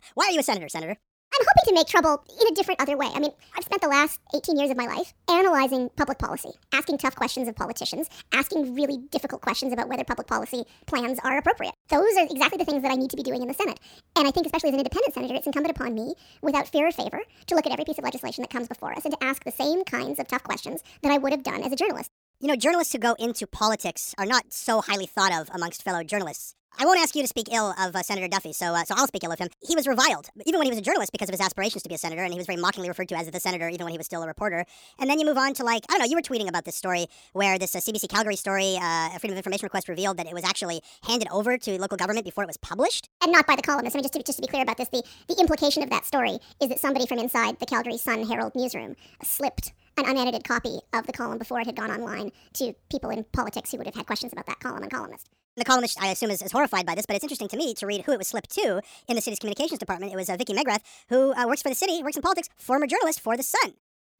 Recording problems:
wrong speed and pitch; too fast and too high; 1.5 times normal speed

